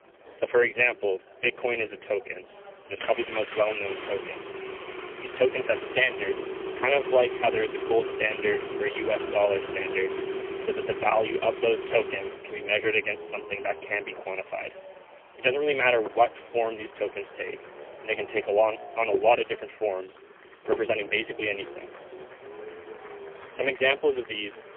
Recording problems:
phone-call audio; poor line; nothing above 3 kHz
traffic noise; loud; throughout; 10 dB below the speech
chatter from many people; faint; throughout; 25 dB below the speech

